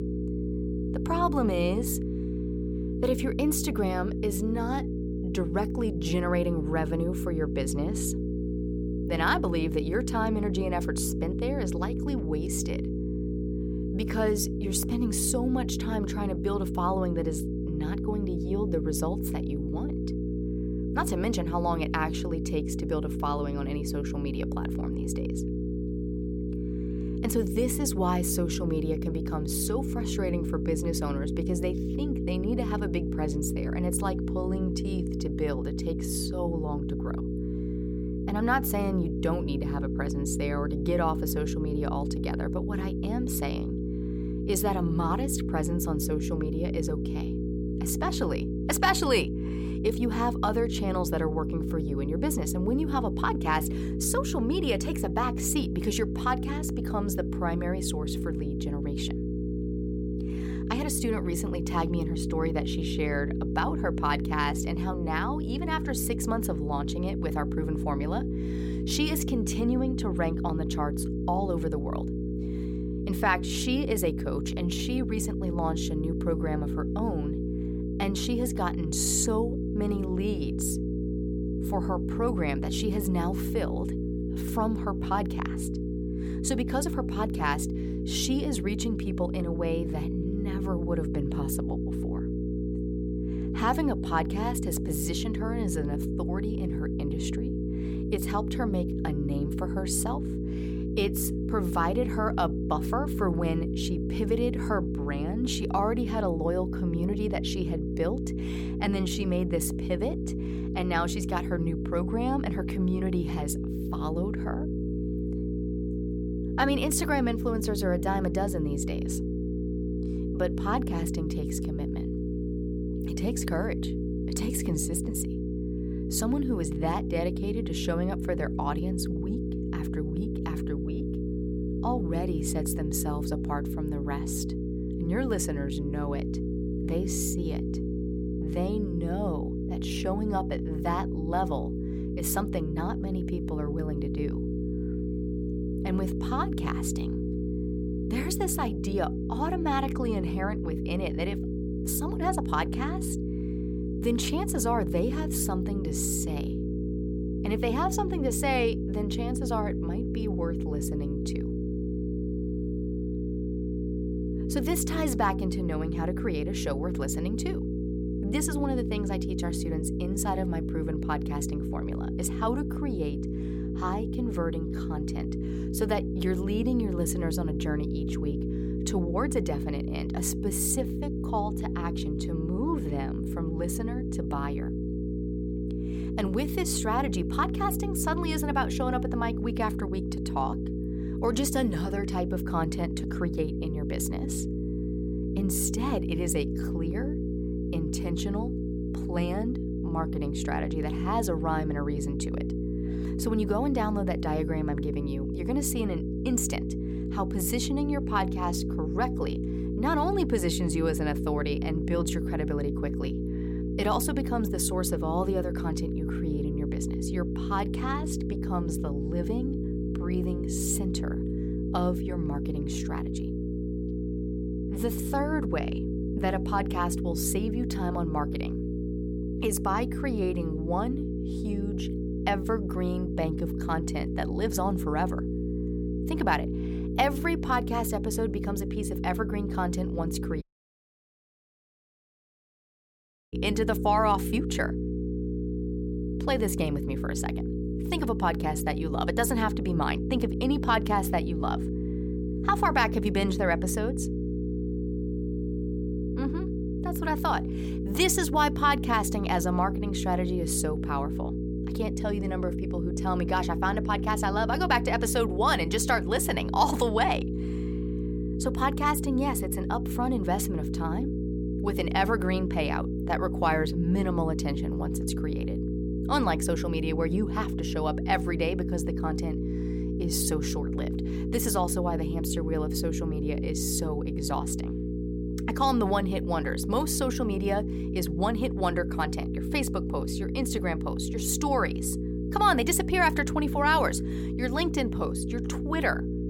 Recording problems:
electrical hum; loud; throughout; 60 Hz, 6 dB below the speech
audio cutting out; at 4:00 for 3 s

